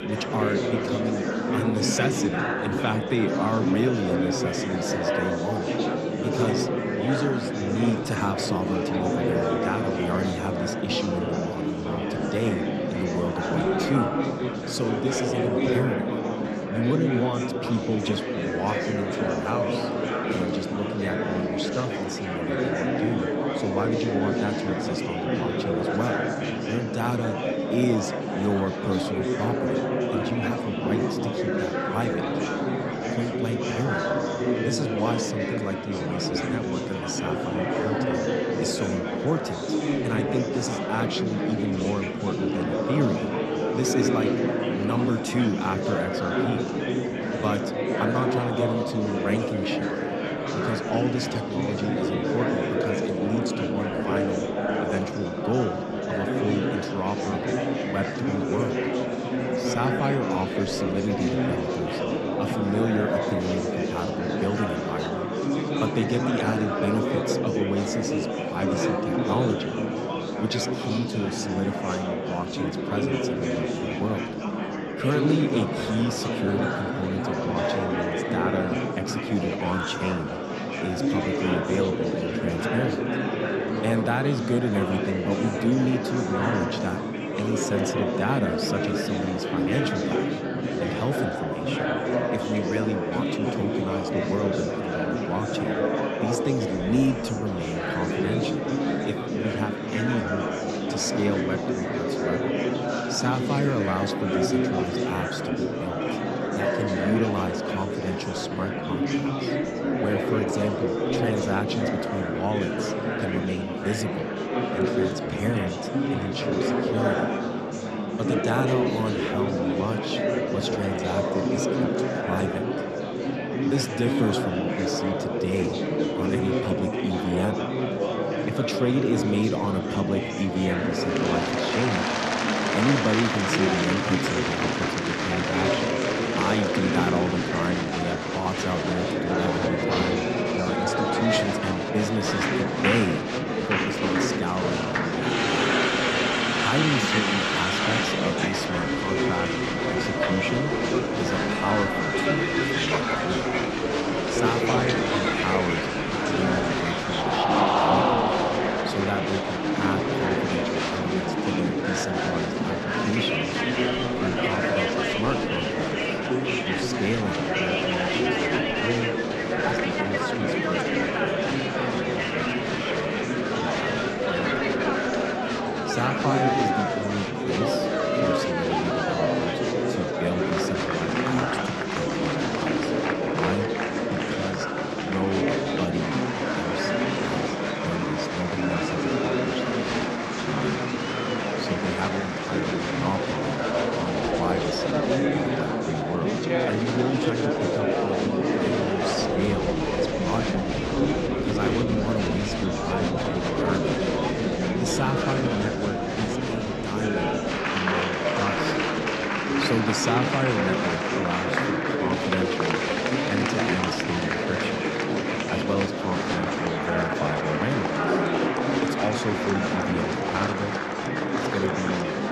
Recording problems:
murmuring crowd; very loud; throughout; 4 dB above the speech

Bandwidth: 13.5 kHz